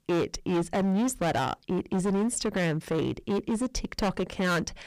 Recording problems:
distortion; heavy; 20% of the sound clipped

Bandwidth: 15 kHz